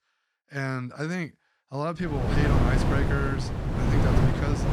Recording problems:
wind noise on the microphone; heavy; from 2 s on; 1 dB above the speech

